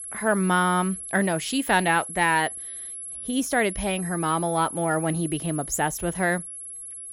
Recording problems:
high-pitched whine; loud; throughout; 11 kHz, 9 dB below the speech

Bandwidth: 16 kHz